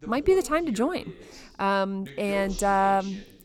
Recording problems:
voice in the background; noticeable; throughout; 20 dB below the speech

